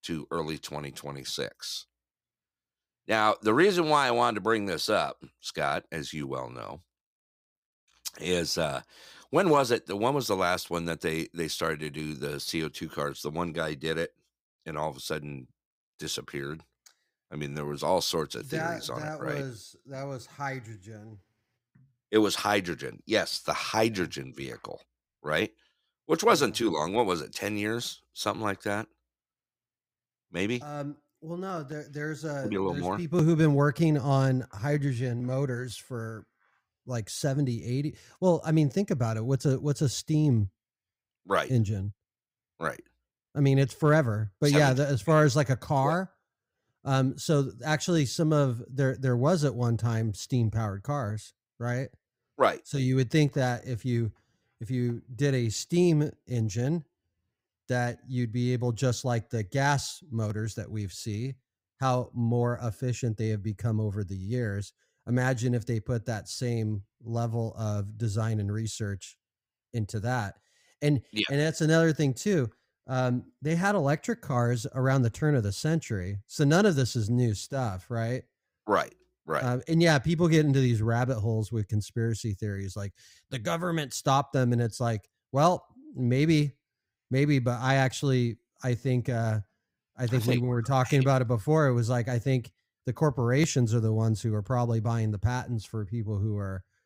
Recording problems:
none

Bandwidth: 15.5 kHz